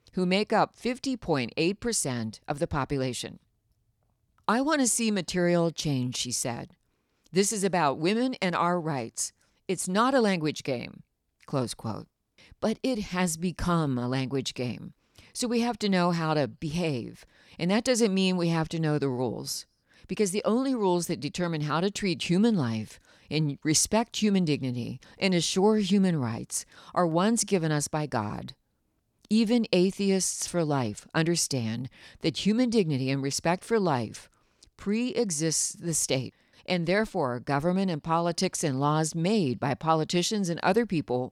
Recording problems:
none

